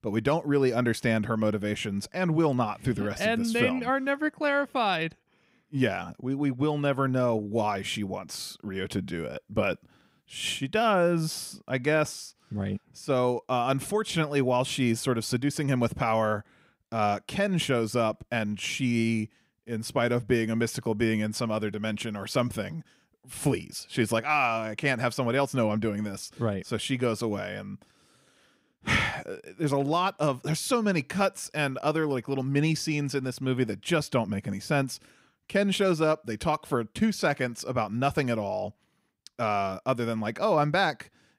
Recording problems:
none

